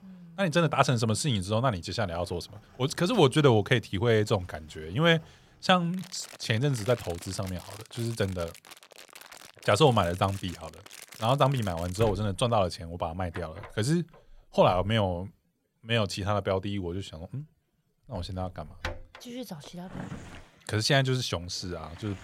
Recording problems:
household noises; noticeable; throughout; 20 dB below the speech

